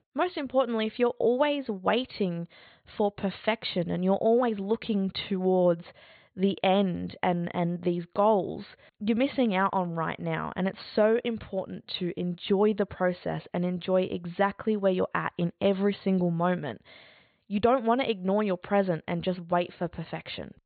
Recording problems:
high frequencies cut off; severe; nothing above 4.5 kHz

